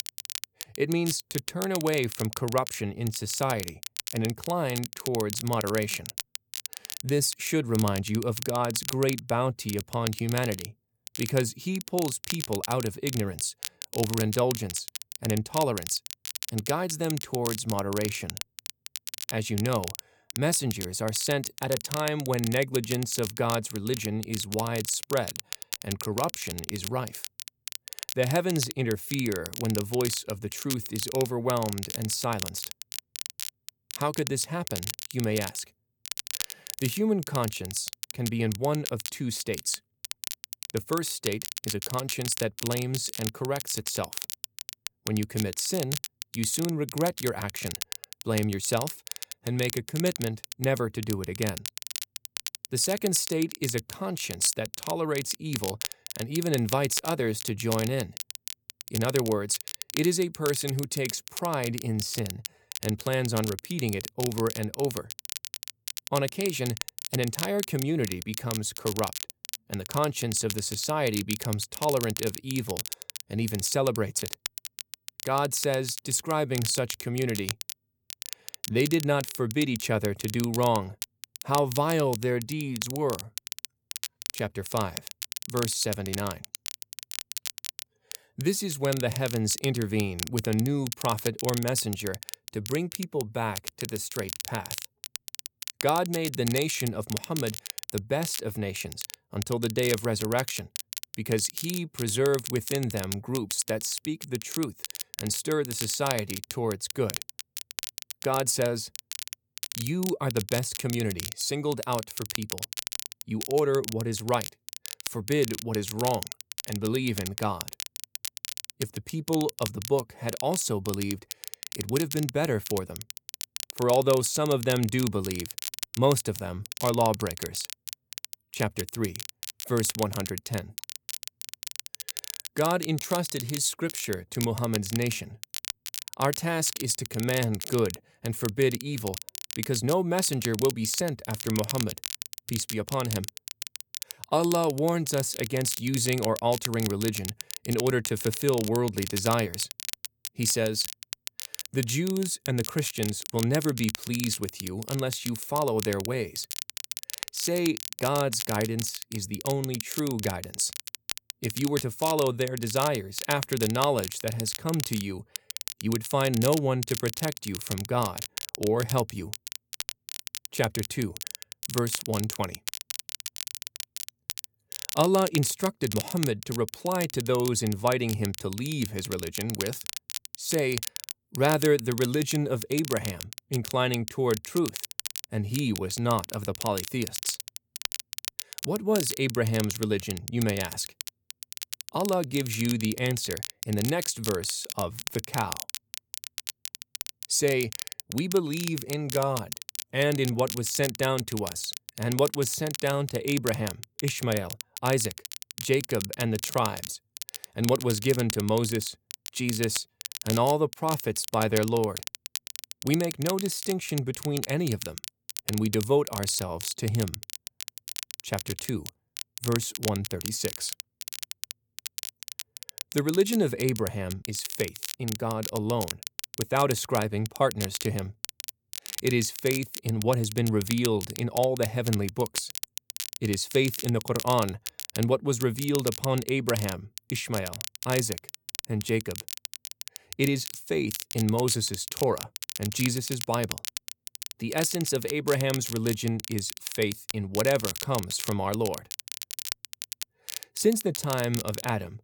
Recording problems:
crackle, like an old record; loud; 7 dB below the speech

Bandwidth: 18.5 kHz